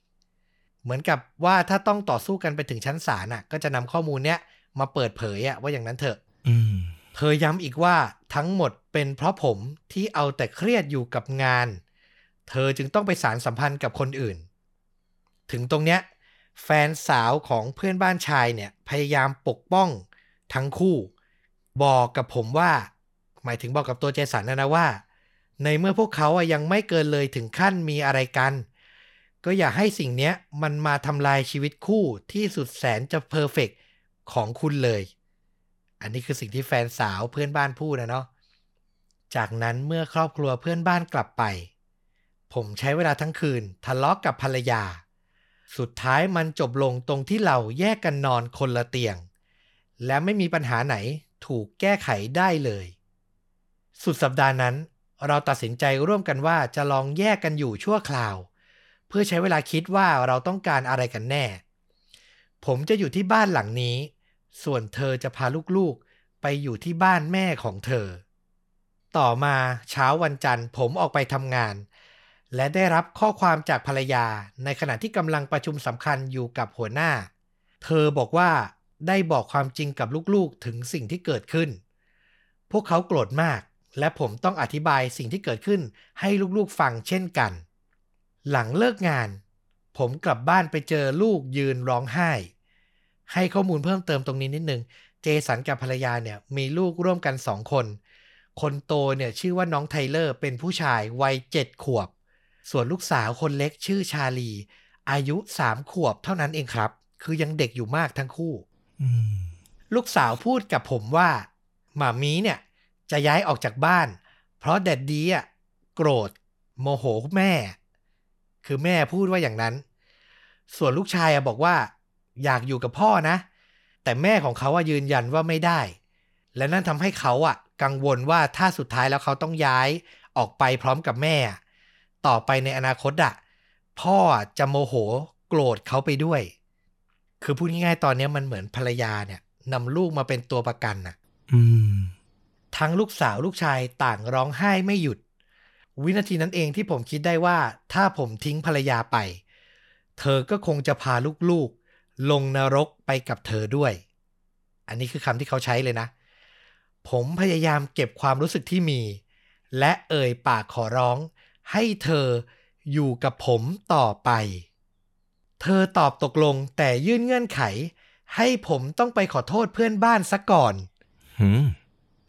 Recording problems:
none

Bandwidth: 17 kHz